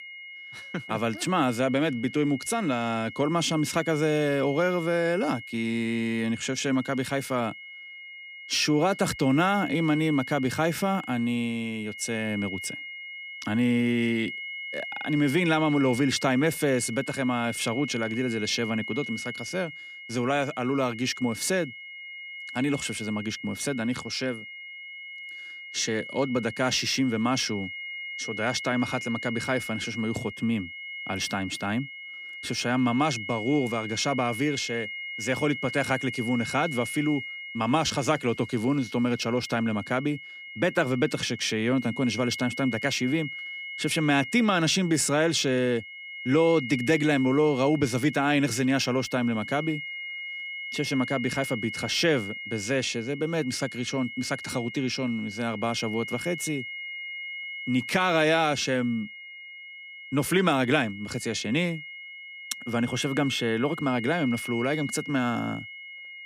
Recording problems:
high-pitched whine; loud; throughout; 2 kHz, 10 dB below the speech

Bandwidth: 15 kHz